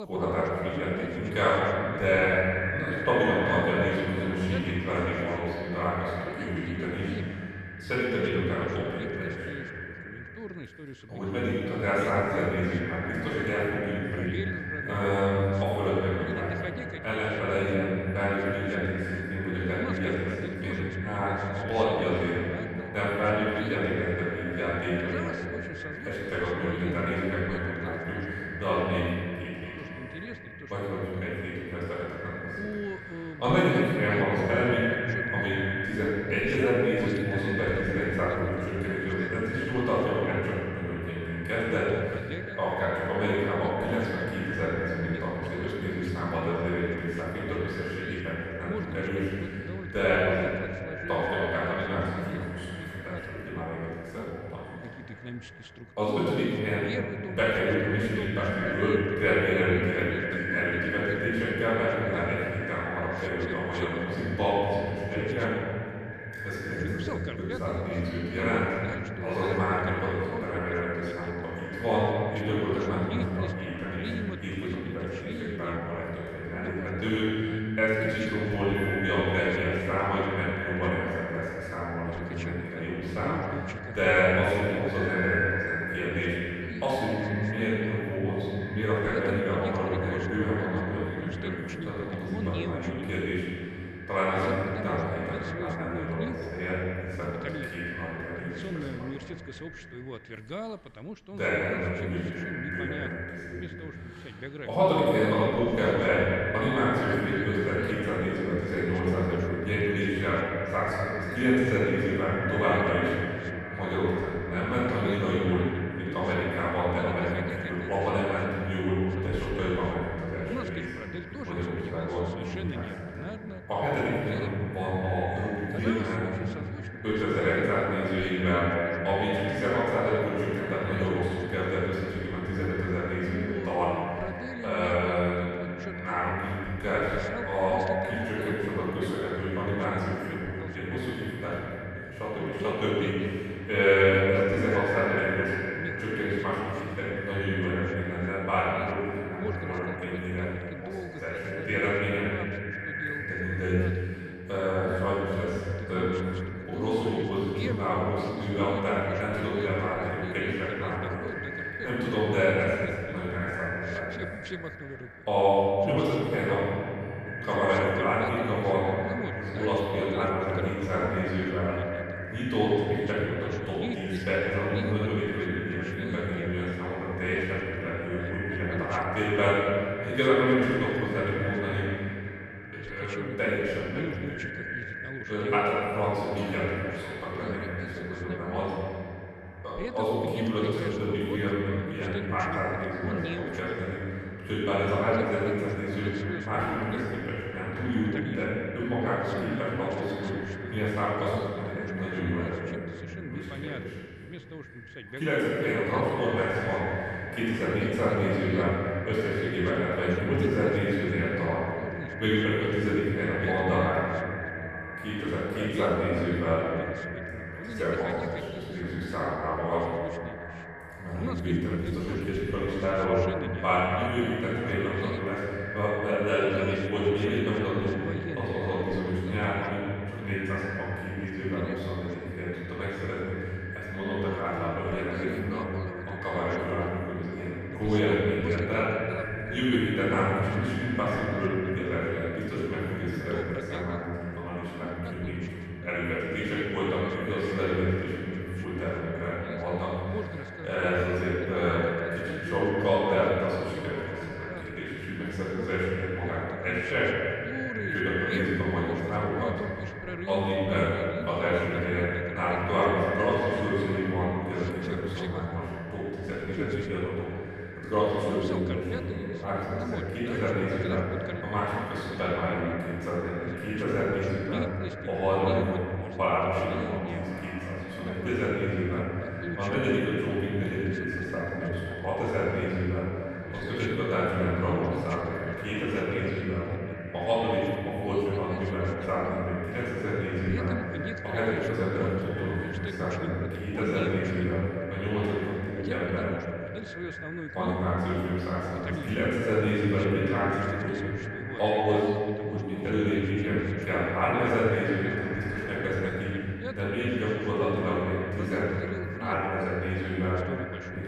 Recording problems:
echo of what is said; strong; throughout; 440 ms later, 10 dB below the speech
room echo; strong; dies away in 2.7 s
off-mic speech; far
voice in the background; noticeable; throughout; 10 dB below the speech

